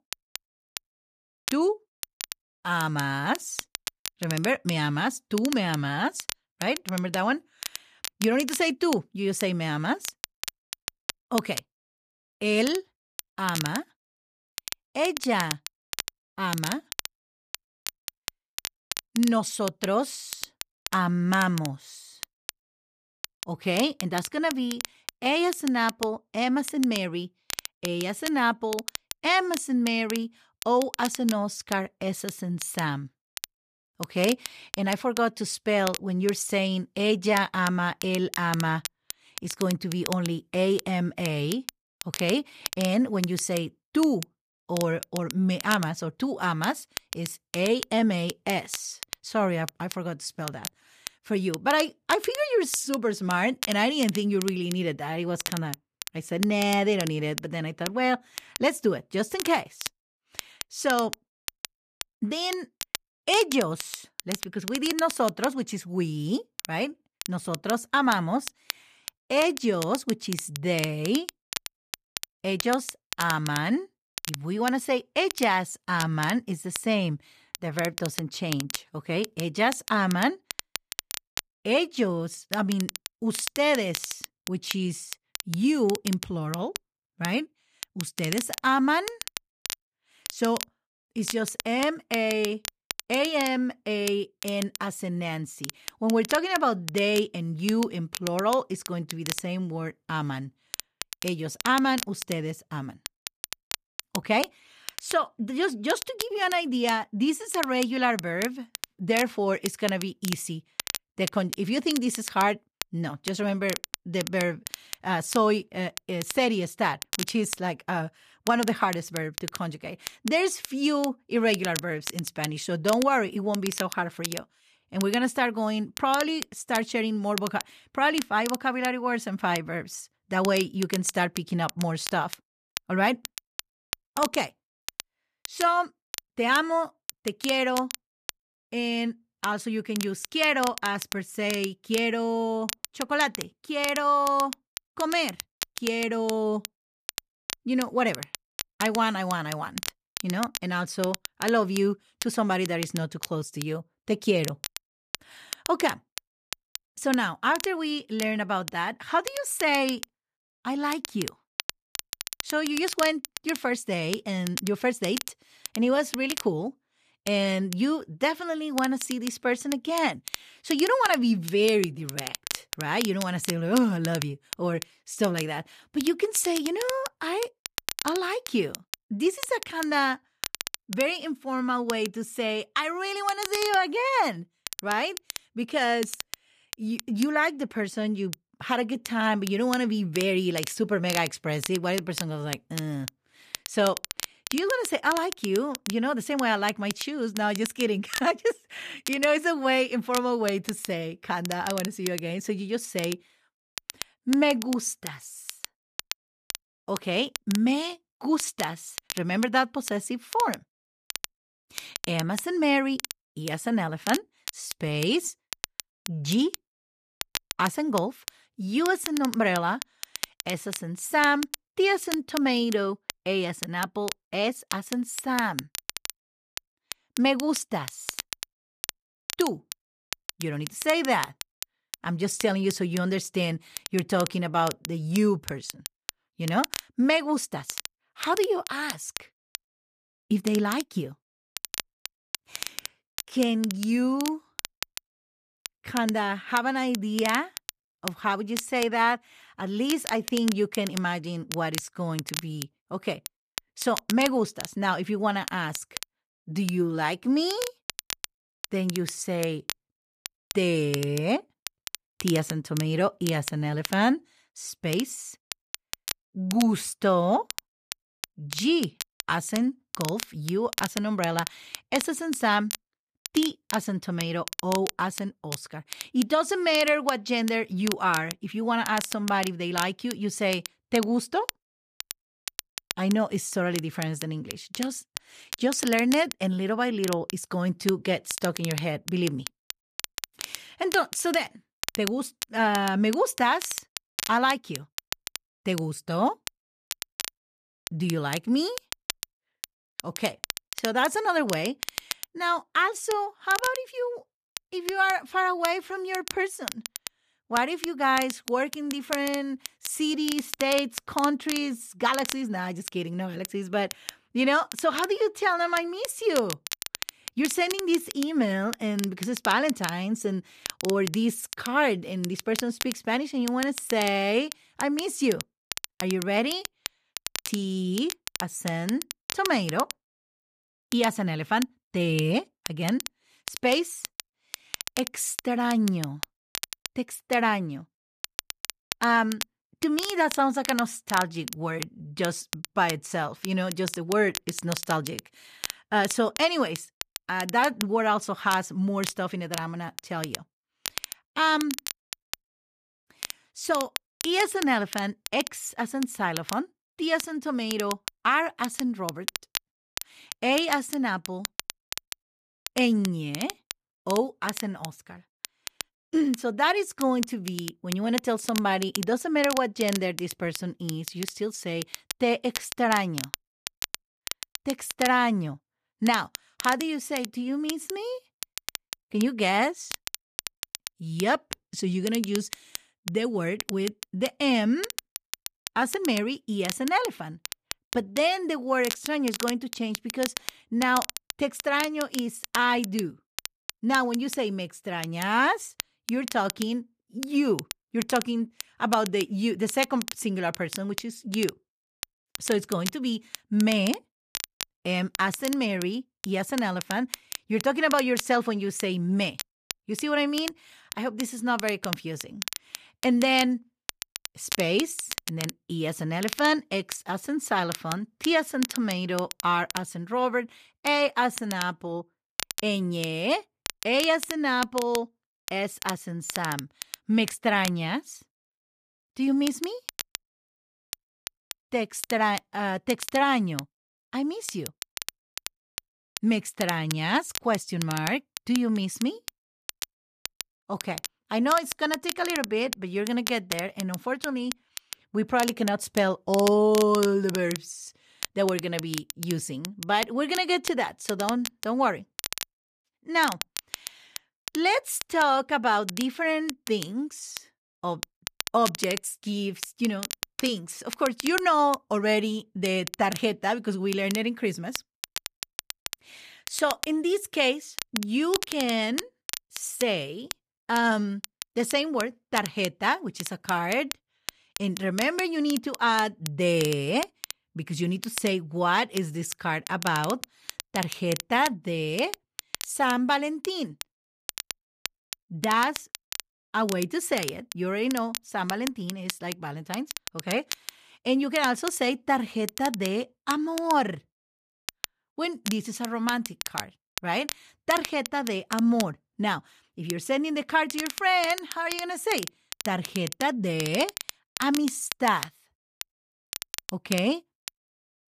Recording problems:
crackle, like an old record; loud; 10 dB below the speech

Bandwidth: 14.5 kHz